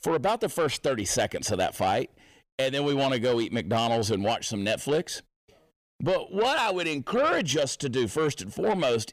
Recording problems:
distortion; slight; 10 dB below the speech

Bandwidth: 15 kHz